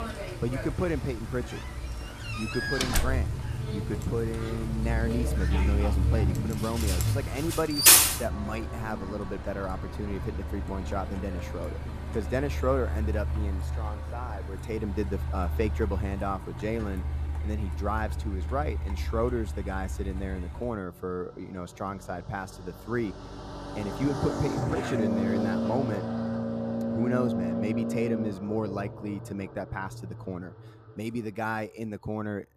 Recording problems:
traffic noise; very loud; throughout; 4 dB above the speech
door banging; loud; at 2.5 s; peak 6 dB above the speech

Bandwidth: 14.5 kHz